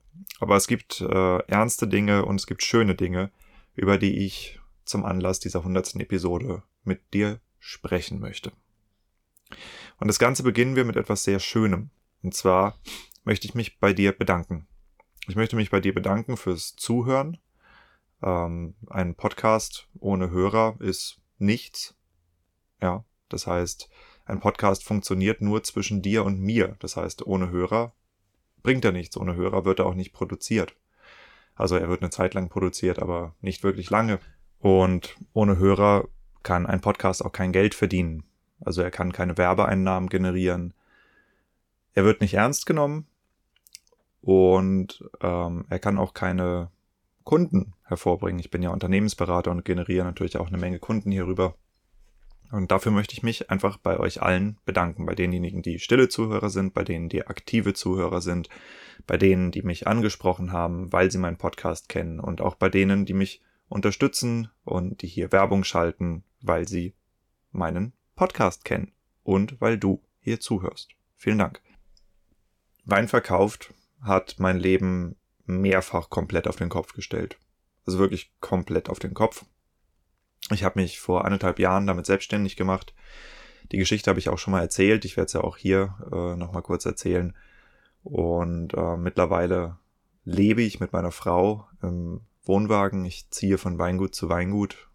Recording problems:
none

